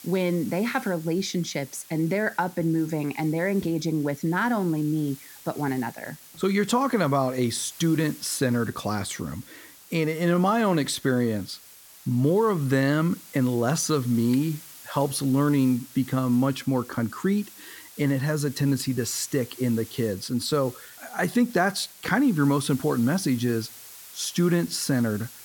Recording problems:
hiss; noticeable; throughout; 20 dB below the speech

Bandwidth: 17 kHz